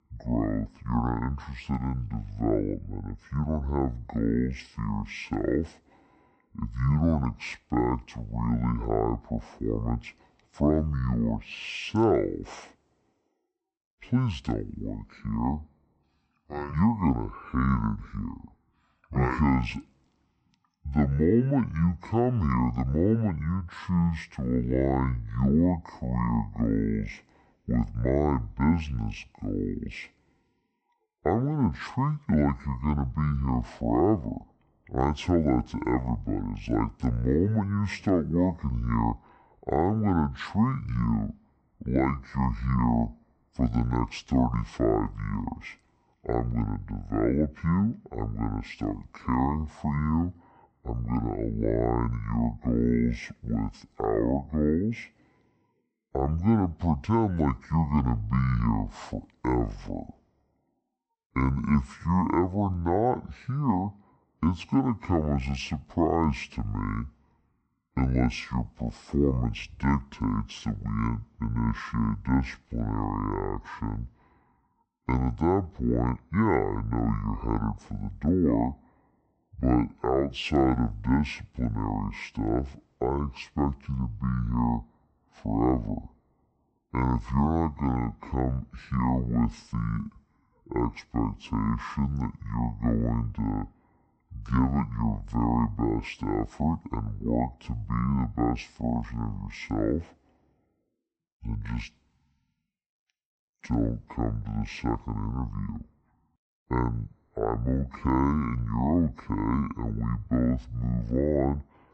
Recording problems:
wrong speed and pitch; too slow and too low; 0.6 times normal speed

